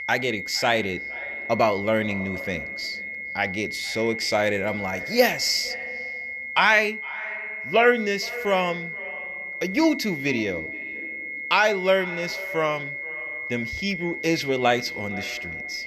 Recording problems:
echo of what is said; noticeable; throughout; 460 ms later, 20 dB below the speech
high-pitched whine; loud; throughout; 2 kHz, 7 dB below the speech

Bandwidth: 13.5 kHz